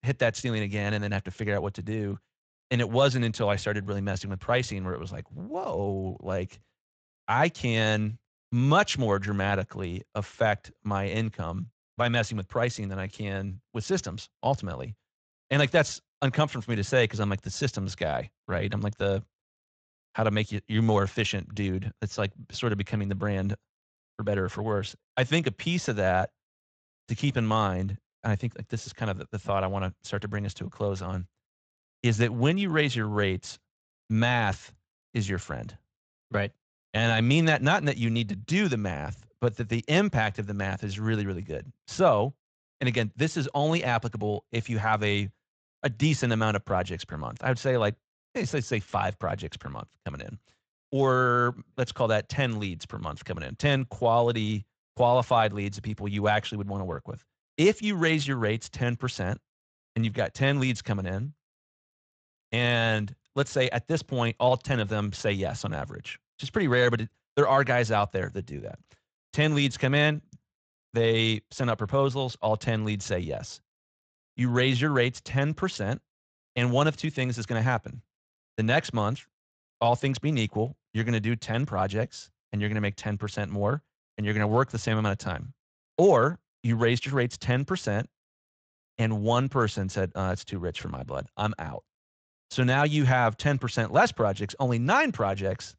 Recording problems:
garbled, watery; slightly; nothing above 7.5 kHz

